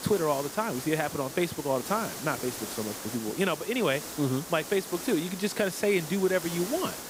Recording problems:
hiss; loud; throughout; 8 dB below the speech

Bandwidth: 15.5 kHz